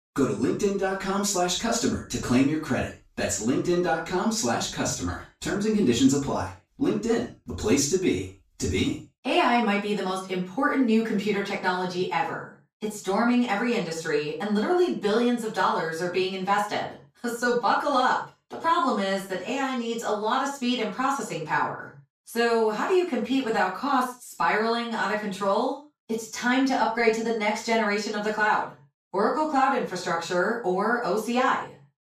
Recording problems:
off-mic speech; far
room echo; noticeable; dies away in 0.3 s

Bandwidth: 14.5 kHz